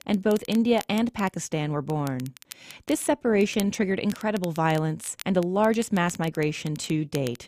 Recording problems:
crackle, like an old record; noticeable; 20 dB below the speech

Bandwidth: 14.5 kHz